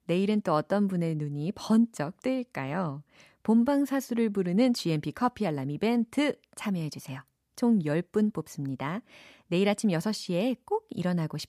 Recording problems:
none

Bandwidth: 14.5 kHz